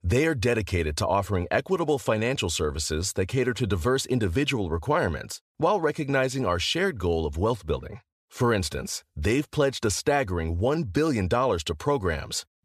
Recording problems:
none

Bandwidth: 14.5 kHz